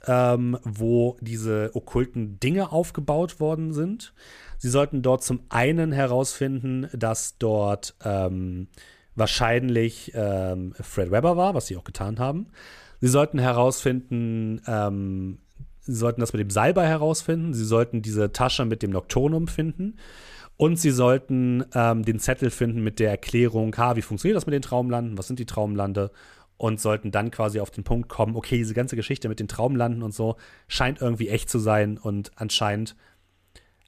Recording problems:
none

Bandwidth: 14.5 kHz